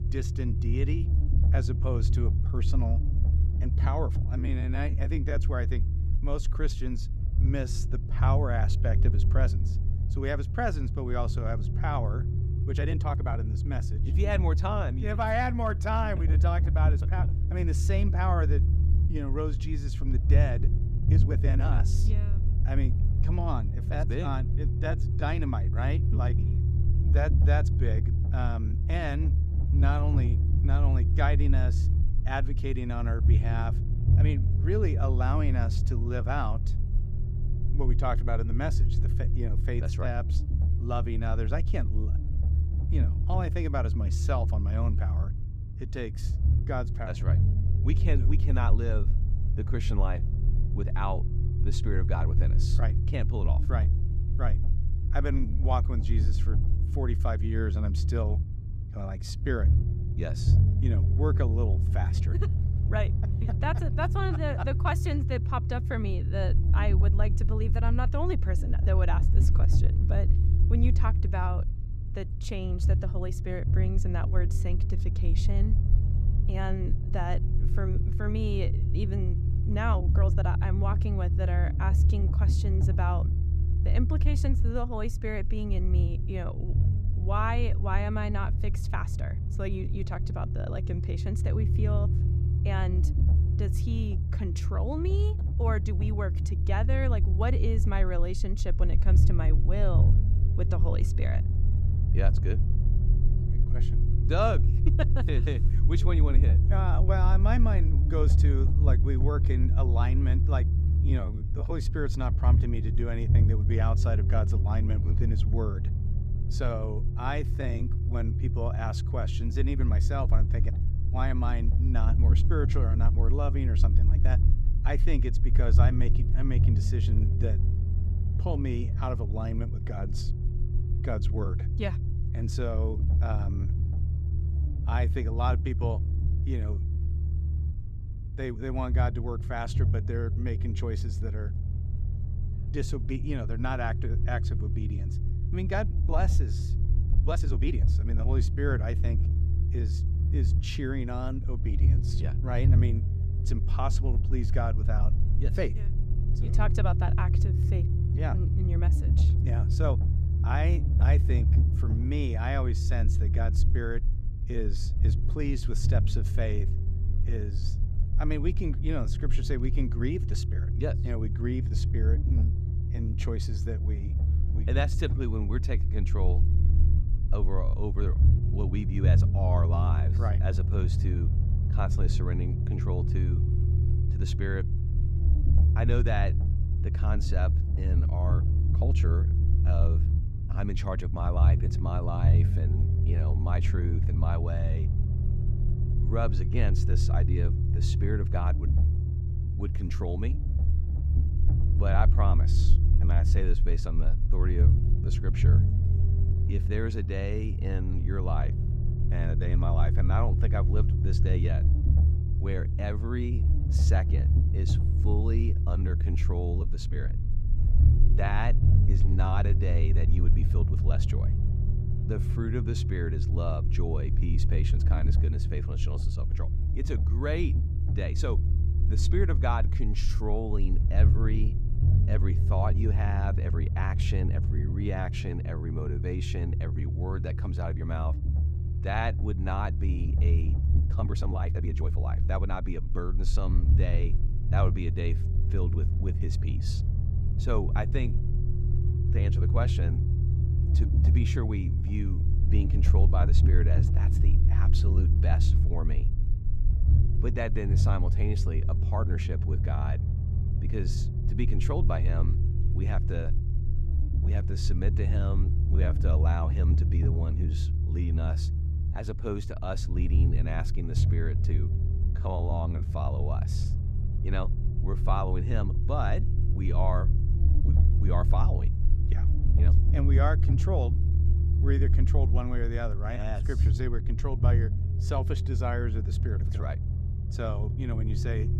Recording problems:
low rumble; loud; throughout; 6 dB below the speech
uneven, jittery; strongly; from 4.5 s to 4:33

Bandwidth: 15.5 kHz